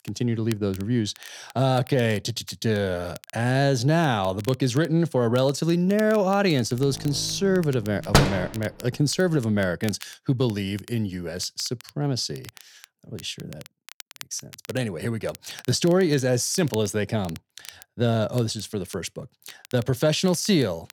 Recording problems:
crackle, like an old record; faint; 20 dB below the speech
door banging; loud; at 8 s; peak 4 dB above the speech

